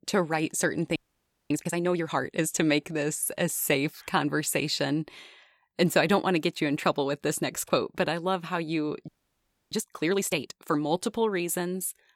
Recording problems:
audio freezing; at 1 s for 0.5 s and at 9 s for 0.5 s

